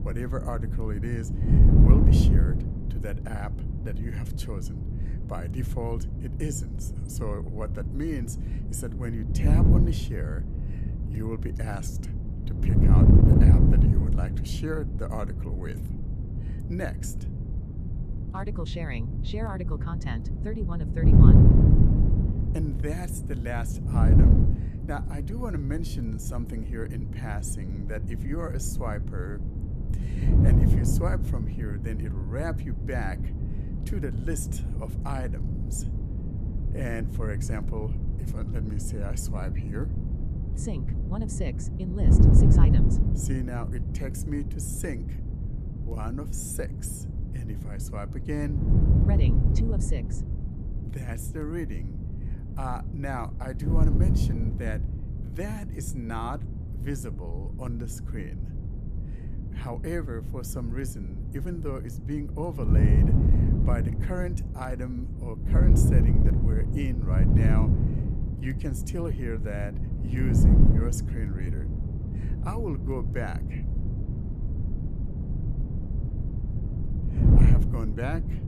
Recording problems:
wind noise on the microphone; heavy; as loud as the speech

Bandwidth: 14.5 kHz